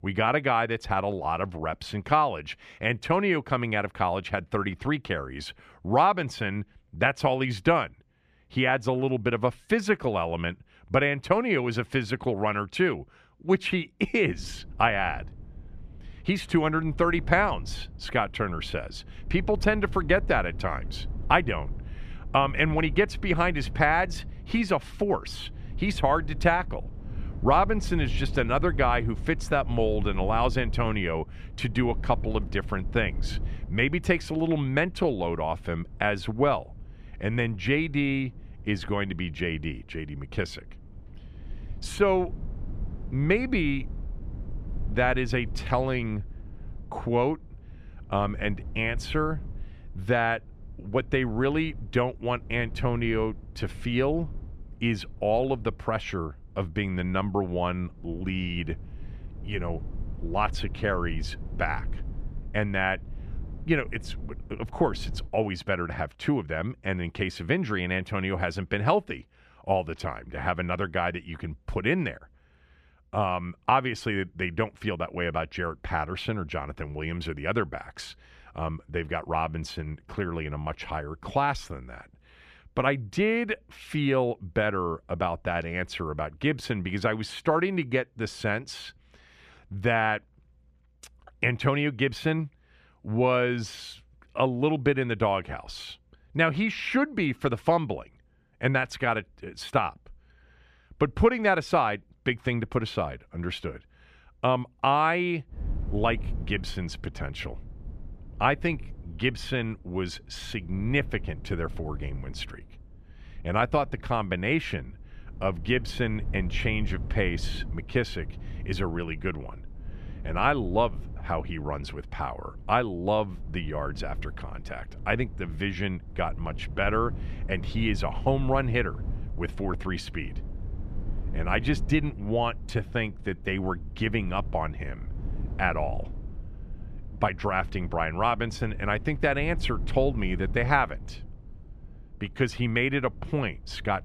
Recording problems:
low rumble; faint; from 14 s to 1:05 and from 1:46 on; 25 dB below the speech

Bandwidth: 14 kHz